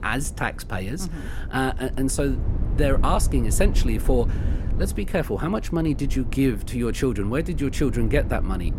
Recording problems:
low rumble; noticeable; throughout; 15 dB below the speech

